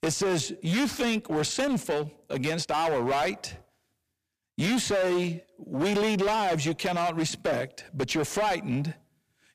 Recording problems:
distortion; heavy; 19% of the sound clipped

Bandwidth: 15 kHz